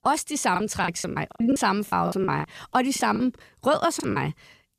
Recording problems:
choppy; very; 16% of the speech affected

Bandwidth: 14.5 kHz